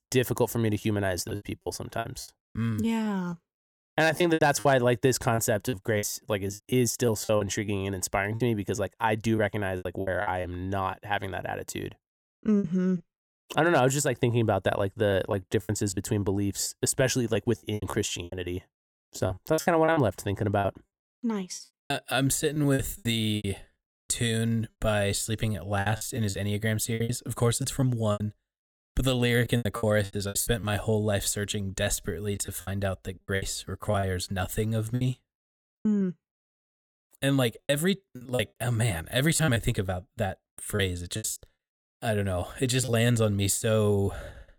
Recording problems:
choppy; very; 11% of the speech affected

